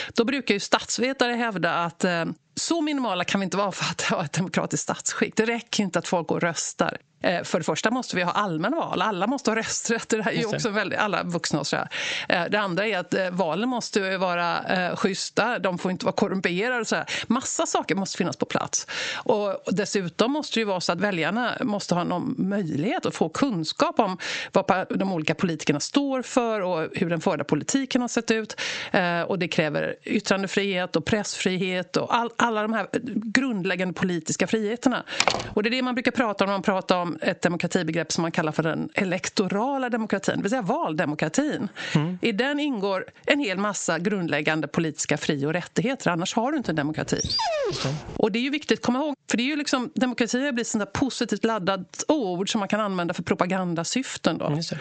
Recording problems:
squashed, flat; heavily
high frequencies cut off; noticeable; nothing above 8 kHz
door banging; loud; at 35 s; peak 2 dB above the speech
dog barking; loud; from 47 to 48 s; peak 1 dB above the speech

